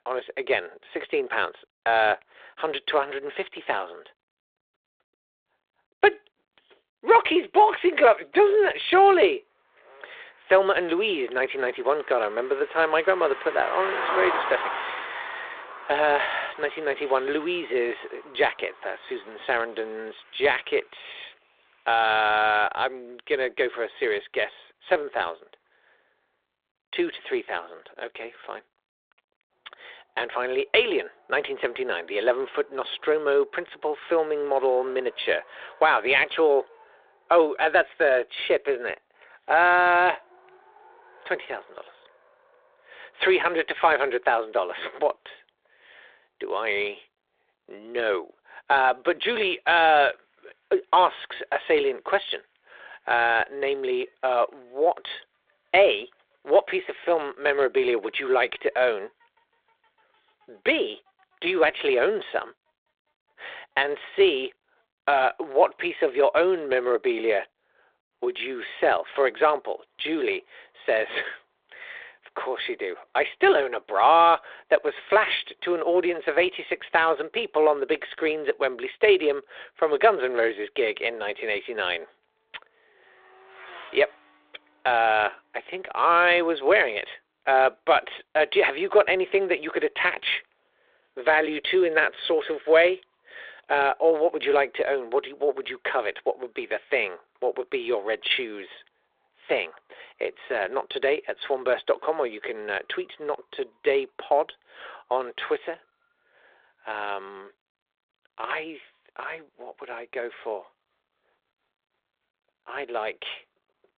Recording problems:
phone-call audio; nothing above 3.5 kHz
traffic noise; noticeable; throughout; 15 dB below the speech

